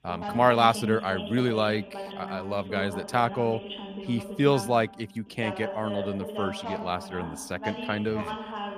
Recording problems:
voice in the background; loud; throughout; 9 dB below the speech

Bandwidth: 15 kHz